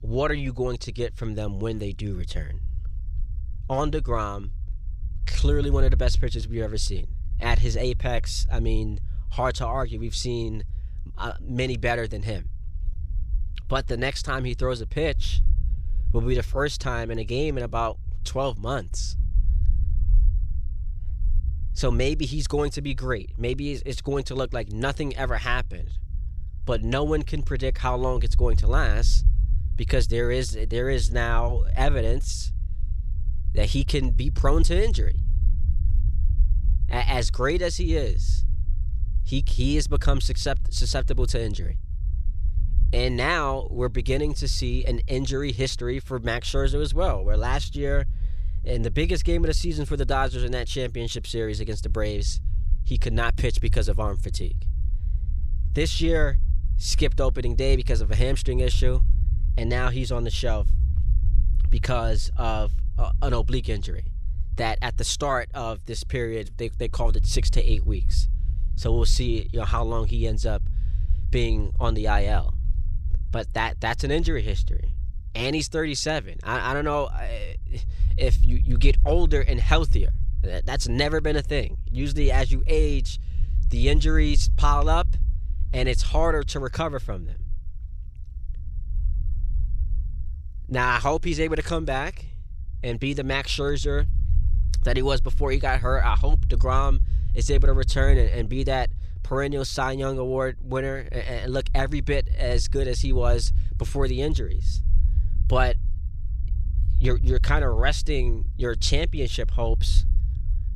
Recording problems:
low rumble; faint; throughout; 20 dB below the speech

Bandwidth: 14.5 kHz